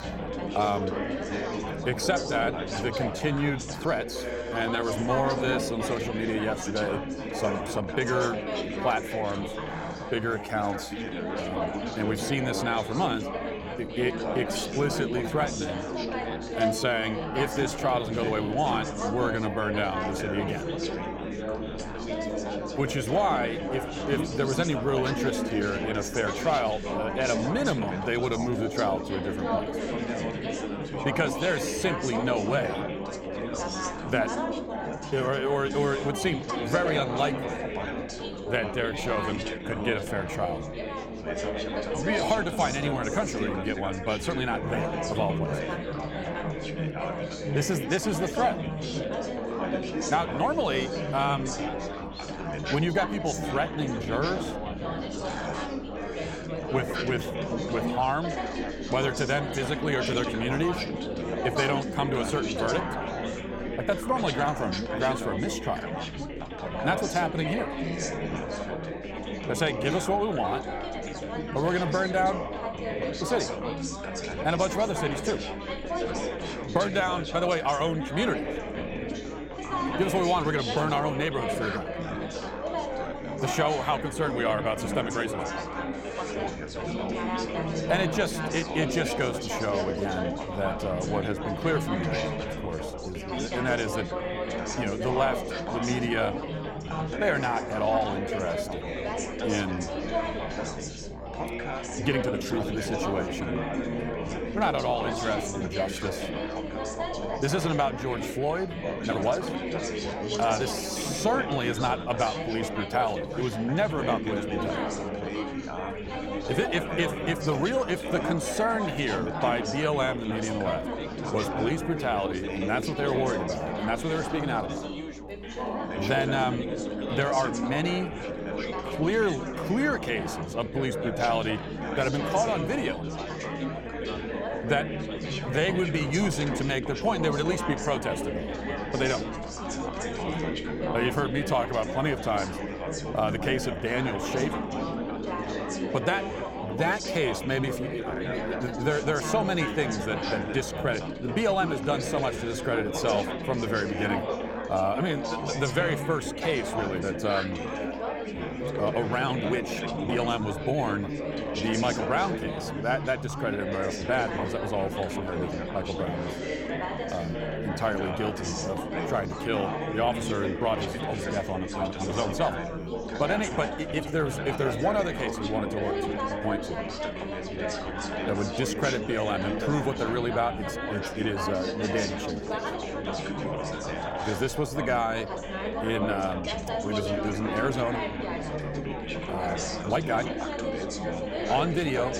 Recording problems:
chatter from many people; loud; throughout; 3 dB below the speech
electrical hum; faint; throughout; 60 Hz, 25 dB below the speech
uneven, jittery; strongly; from 3.5 s to 3:10

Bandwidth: 17 kHz